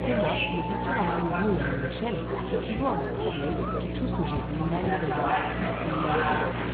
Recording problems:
garbled, watery; badly; nothing above 4 kHz
chatter from many people; very loud; throughout; 2 dB above the speech
electrical hum; loud; throughout; 60 Hz, 7 dB below the speech
footsteps; noticeable; from 3 to 5 s; peak 7 dB below the speech

